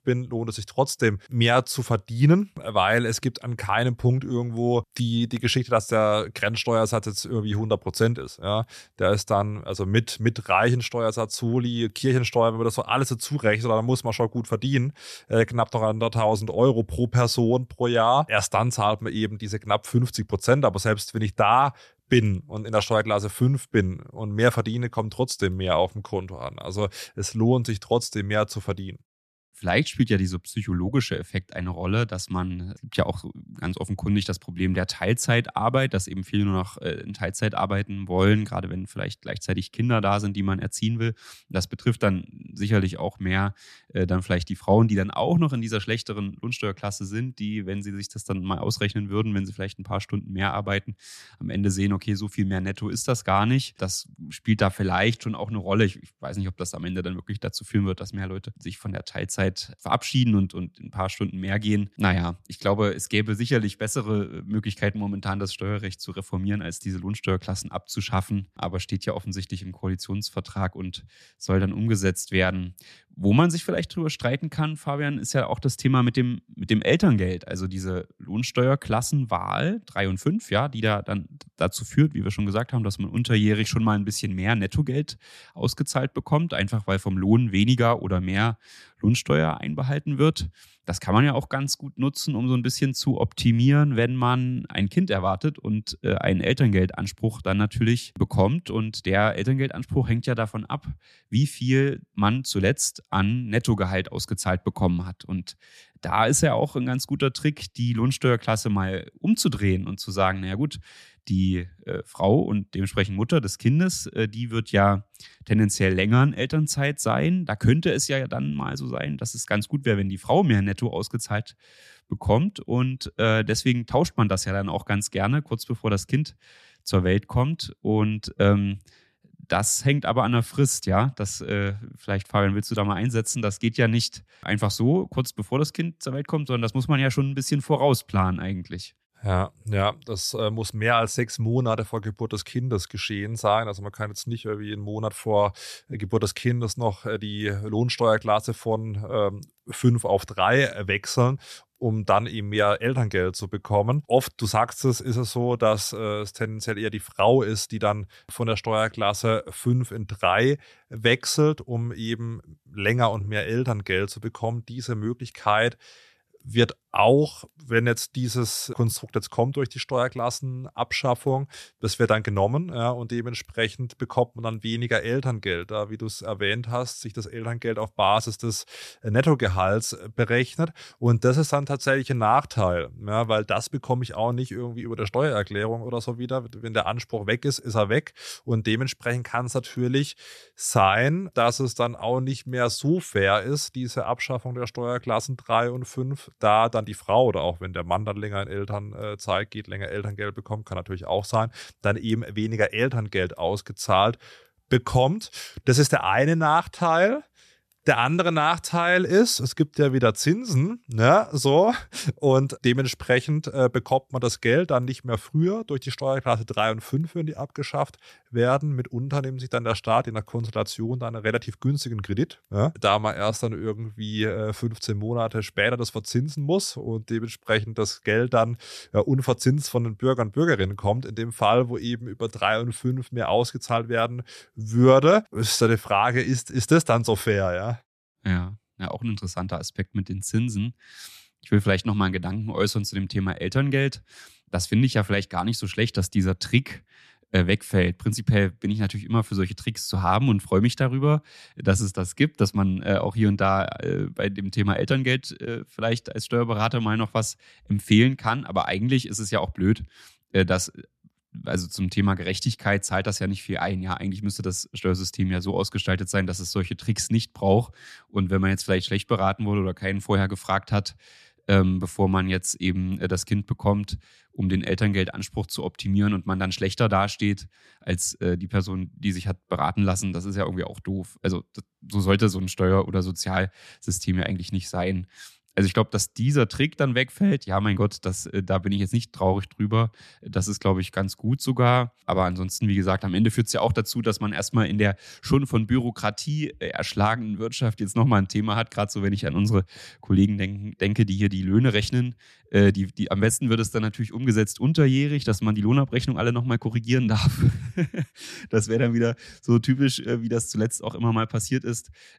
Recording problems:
none

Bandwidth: 13.5 kHz